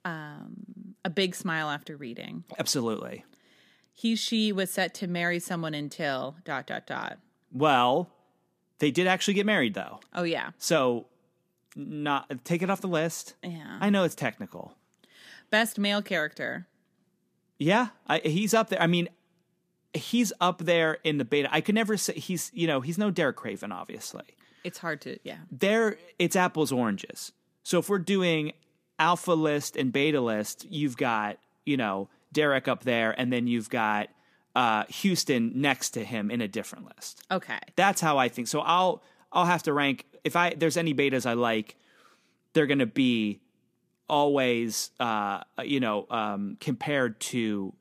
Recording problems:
none

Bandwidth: 15 kHz